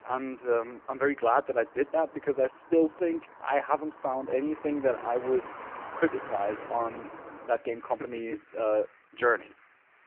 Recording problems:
phone-call audio; poor line
traffic noise; noticeable; throughout; 15 dB below the speech

